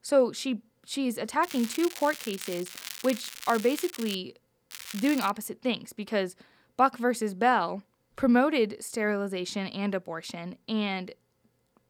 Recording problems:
crackling; noticeable; from 1.5 to 4 s and at 4.5 s; 10 dB below the speech

